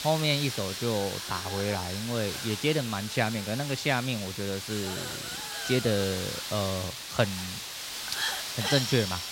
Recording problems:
hiss; loud; throughout; 3 dB below the speech

